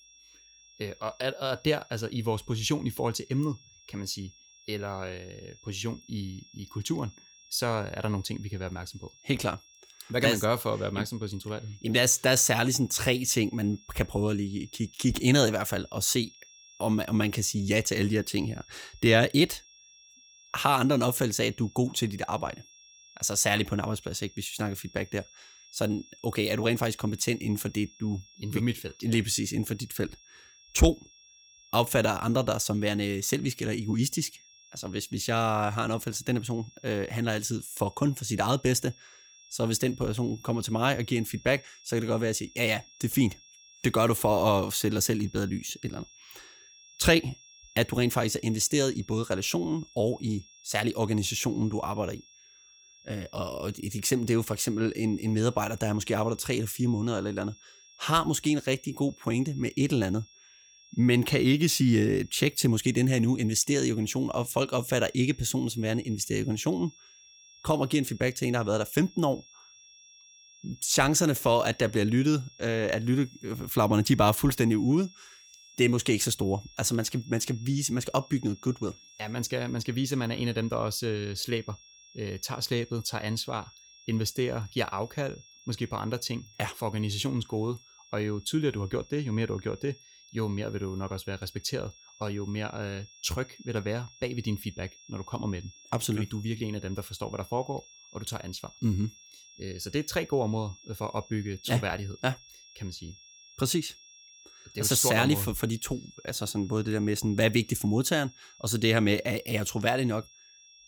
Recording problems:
high-pitched whine; faint; throughout; 5.5 kHz, 25 dB below the speech

